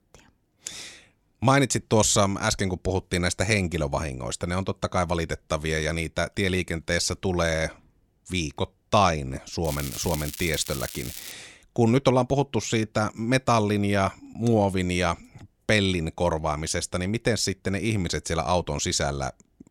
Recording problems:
crackling; noticeable; from 9.5 to 11 s; 10 dB below the speech

